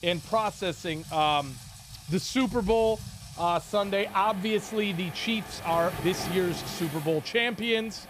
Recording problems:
rain or running water; noticeable; throughout; 15 dB below the speech

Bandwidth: 15 kHz